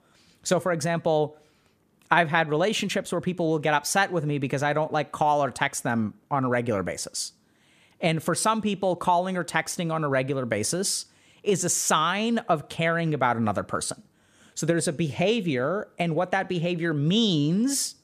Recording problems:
none

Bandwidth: 14.5 kHz